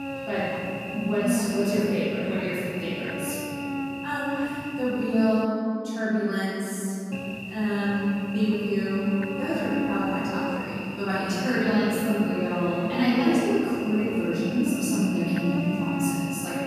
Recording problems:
room echo; strong; dies away in 3 s
off-mic speech; far
electrical hum; loud; until 5.5 s and from 7 s on; 50 Hz, 6 dB below the speech

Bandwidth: 14.5 kHz